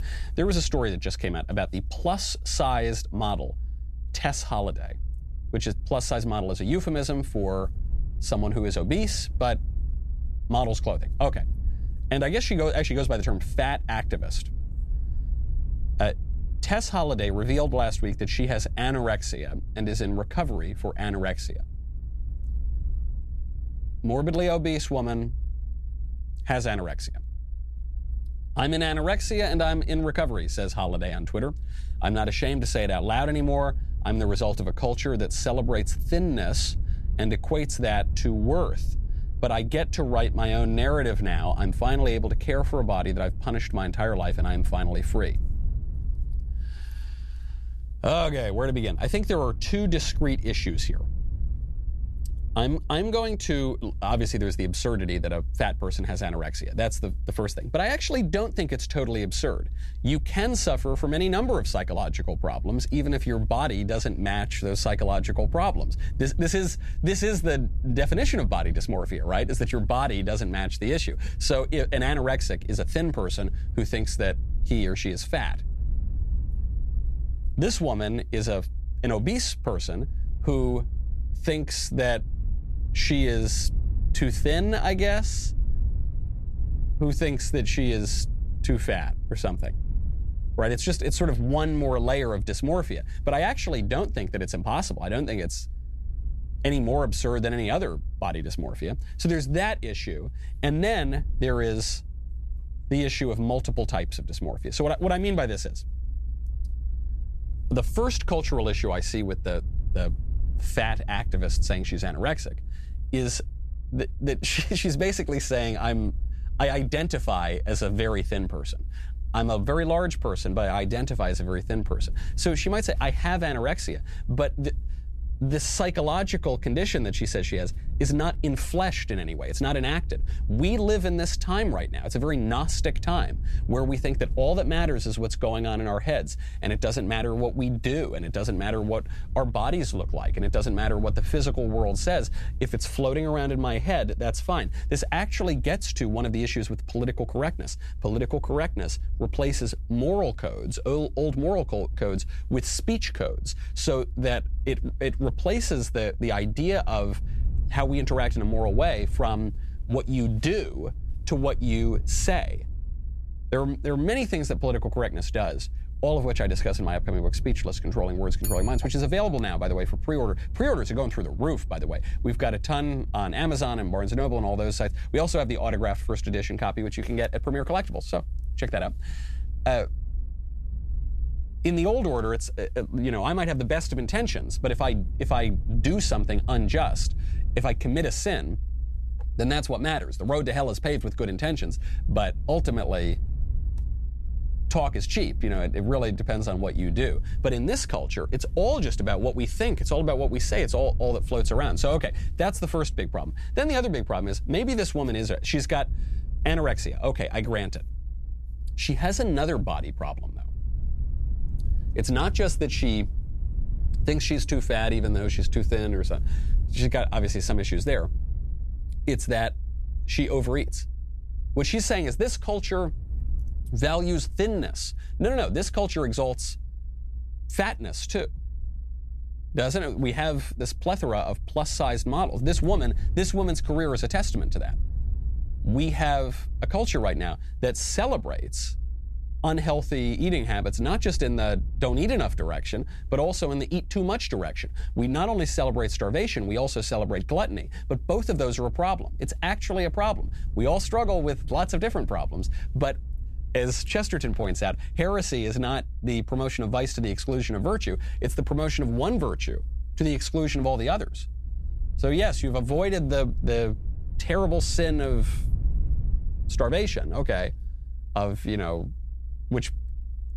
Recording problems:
low rumble; faint; throughout; 25 dB below the speech

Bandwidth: 13.5 kHz